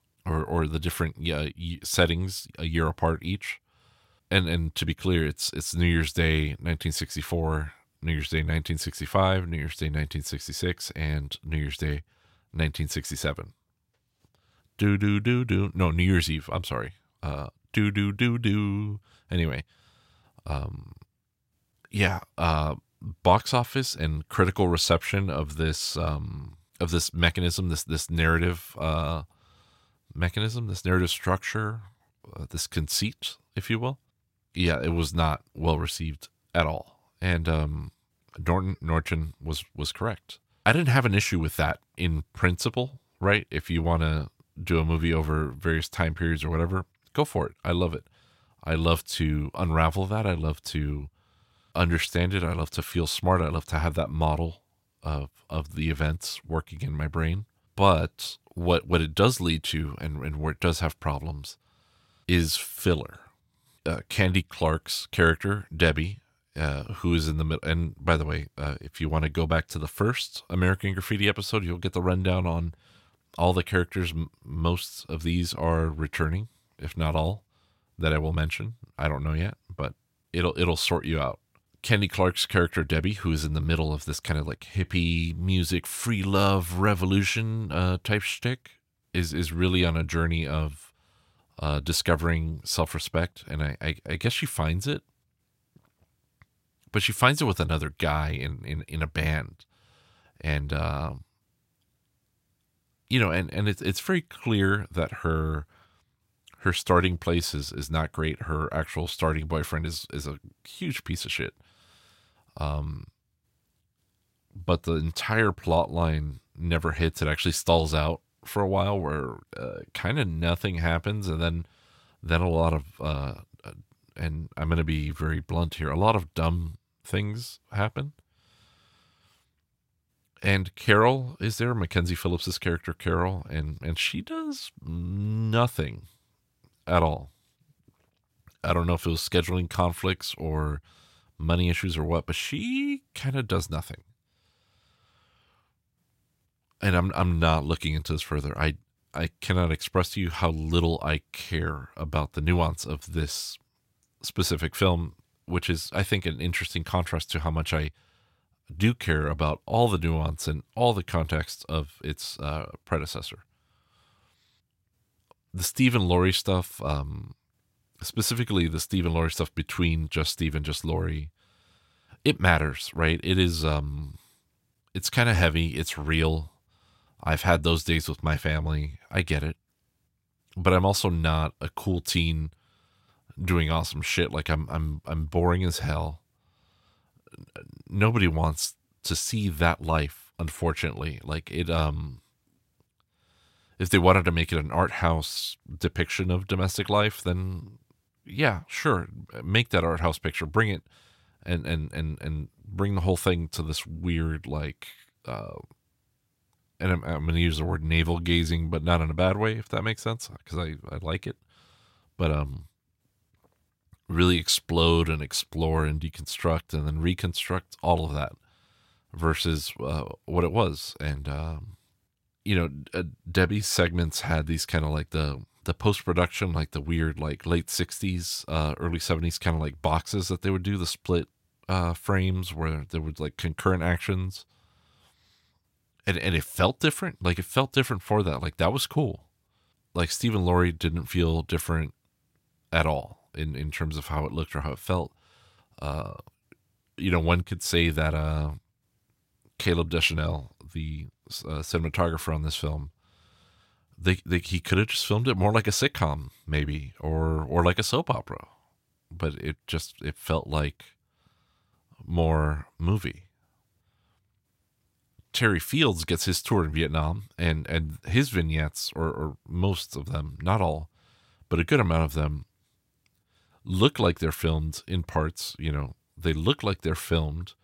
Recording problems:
none

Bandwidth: 16 kHz